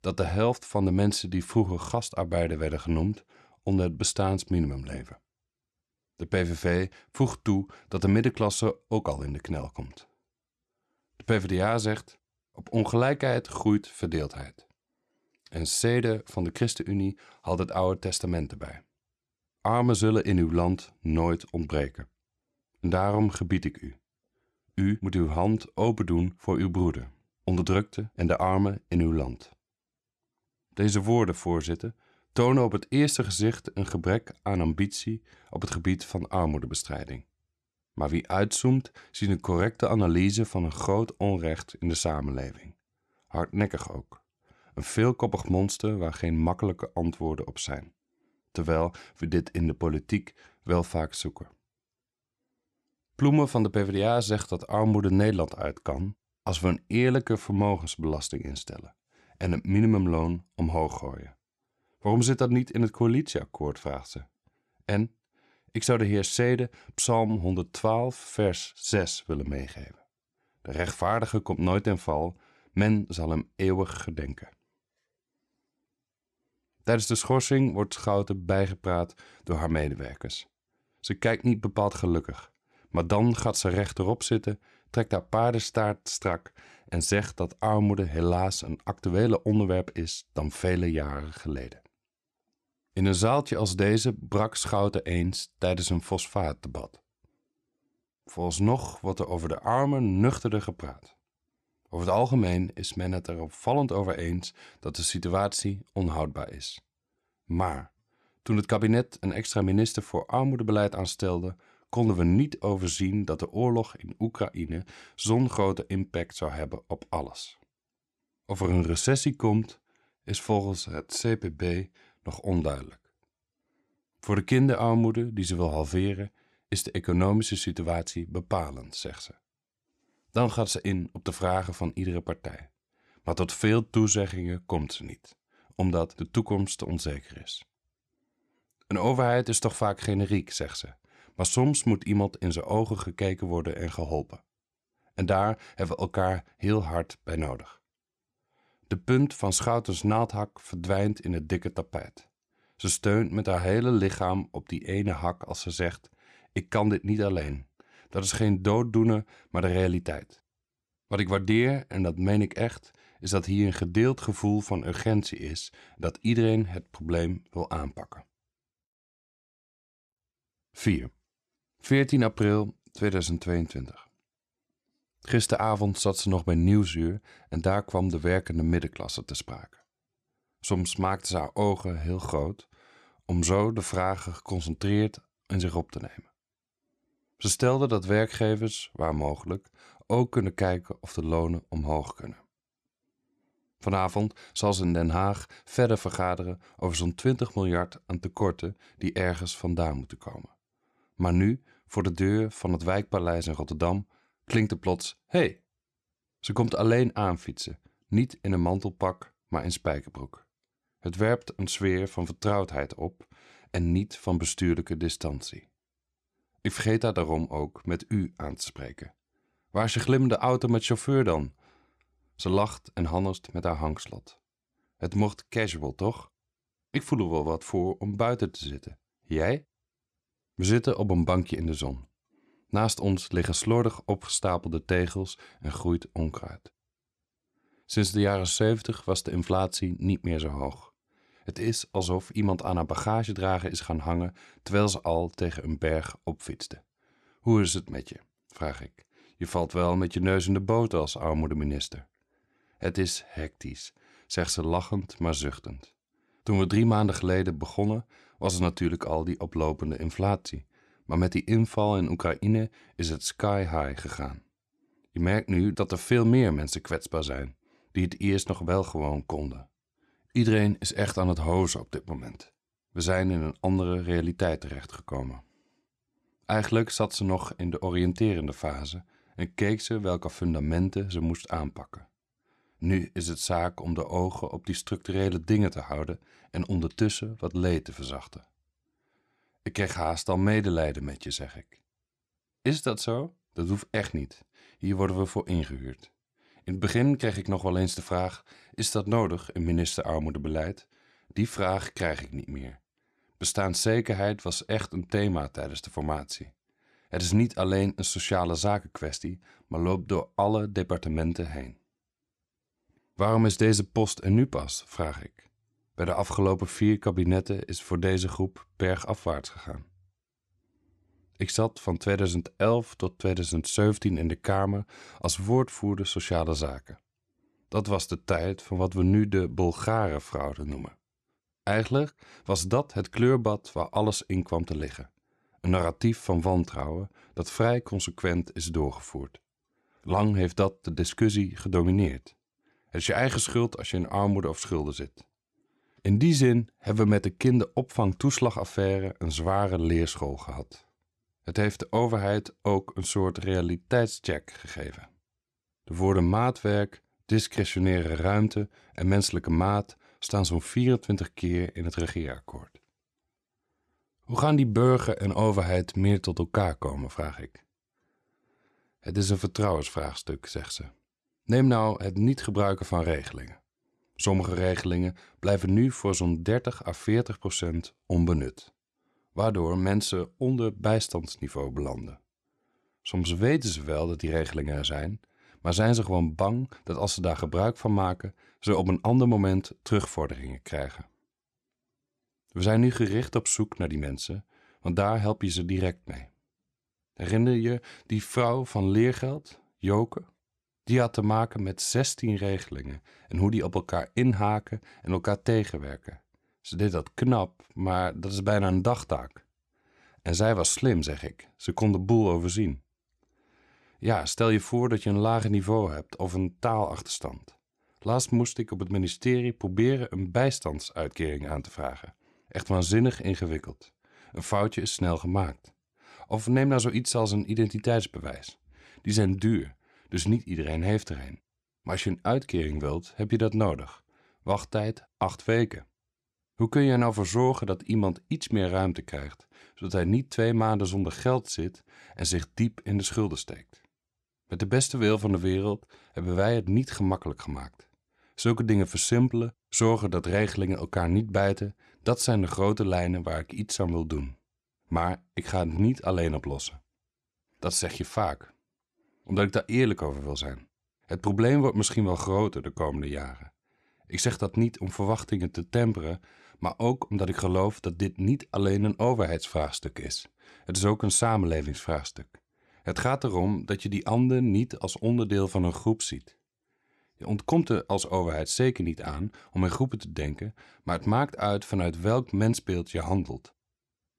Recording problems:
none

